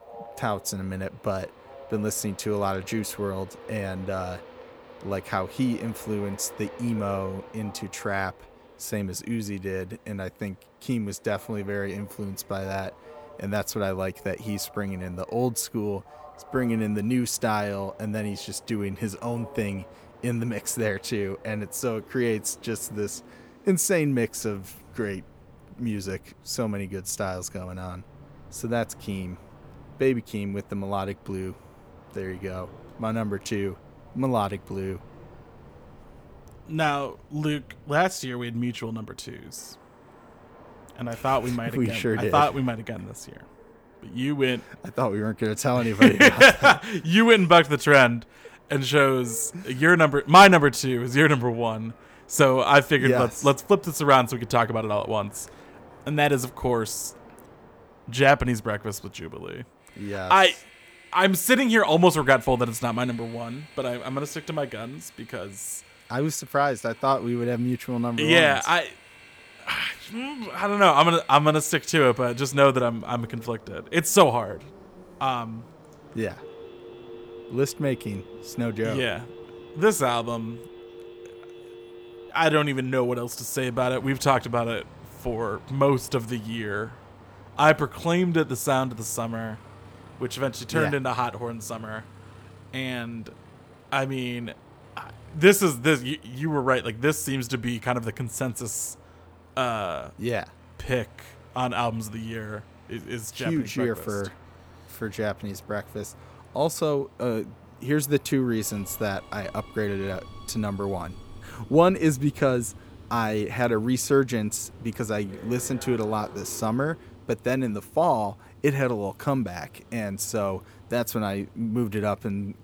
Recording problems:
train or aircraft noise; faint; throughout; 25 dB below the speech
phone ringing; faint; from 1:16 to 1:22; peak 20 dB below the speech

